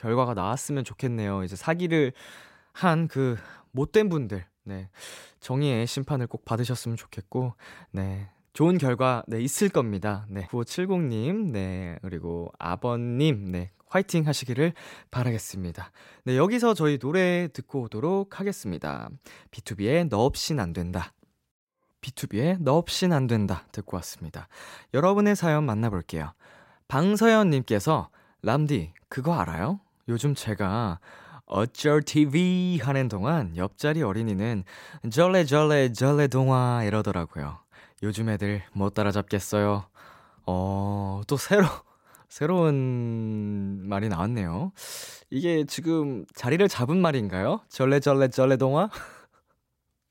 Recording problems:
none

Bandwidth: 16 kHz